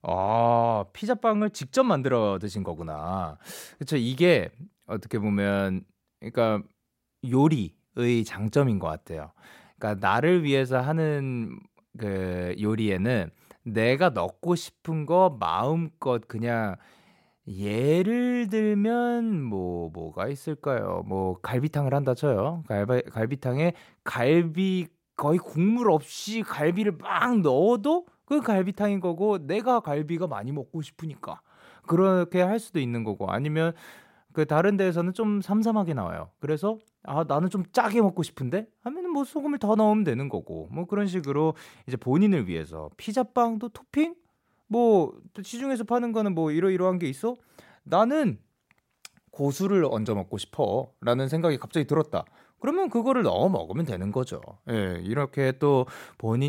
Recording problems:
abrupt cut into speech; at the end

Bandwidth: 16 kHz